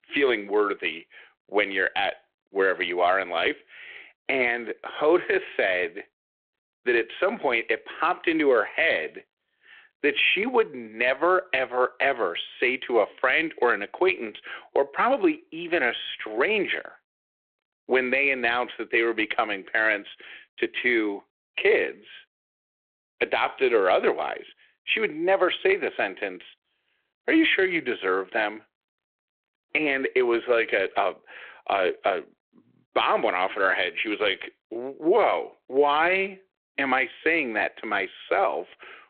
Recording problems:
phone-call audio

